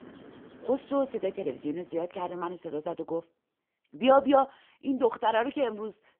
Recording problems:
phone-call audio; poor line; nothing above 3 kHz
traffic noise; faint; throughout; 25 dB below the speech

